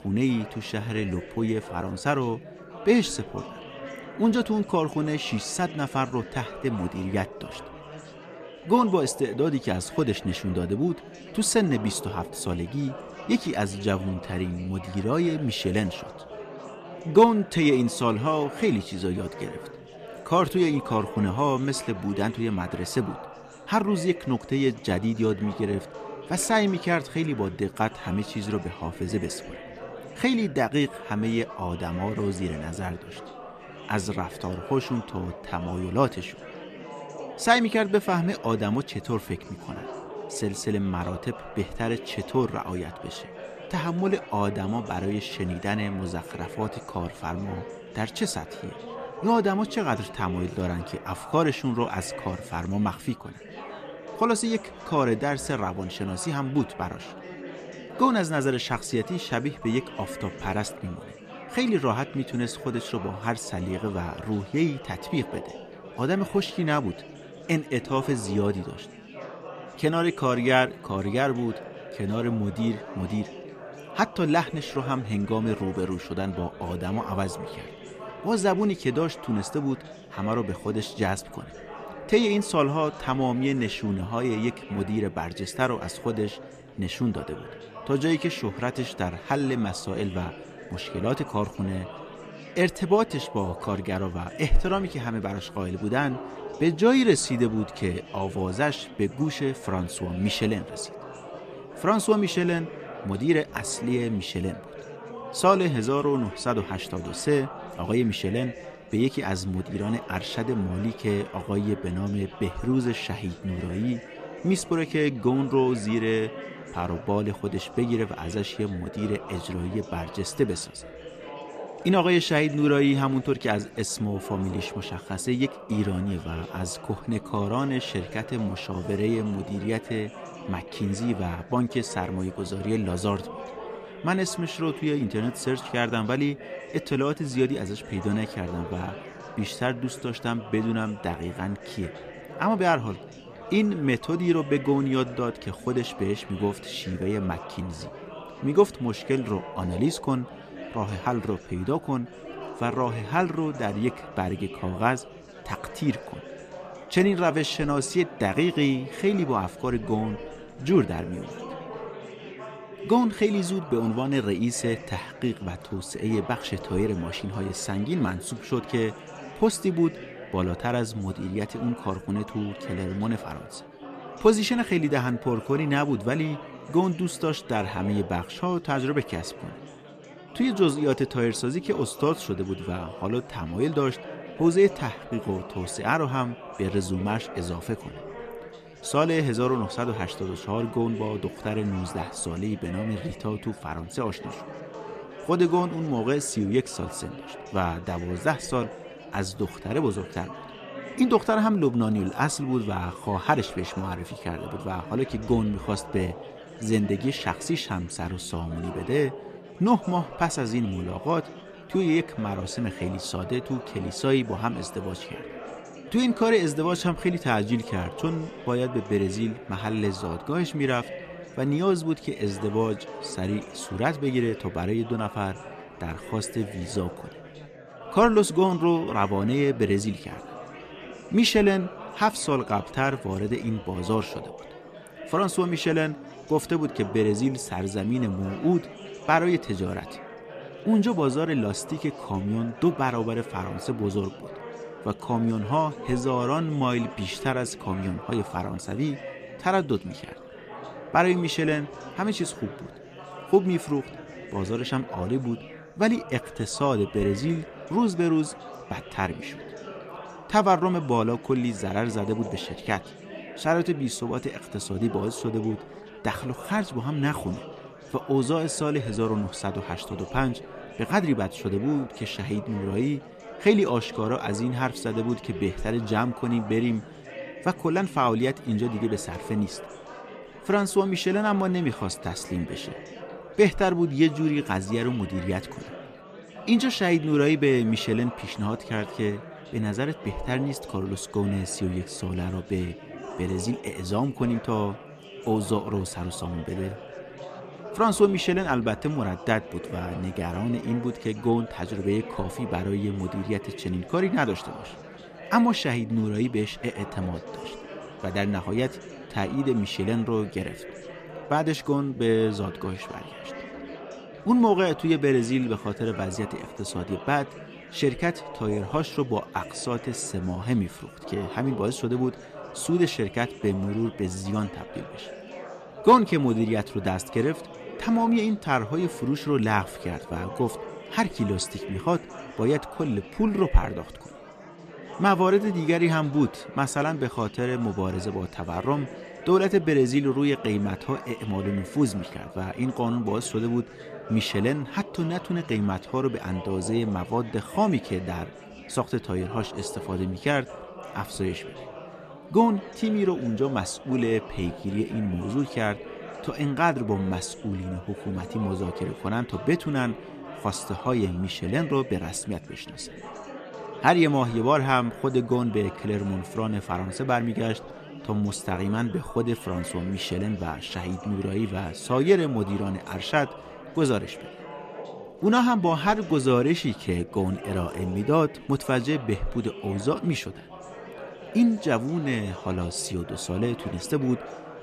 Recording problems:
chatter from many people; noticeable; throughout; 15 dB below the speech

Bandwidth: 14.5 kHz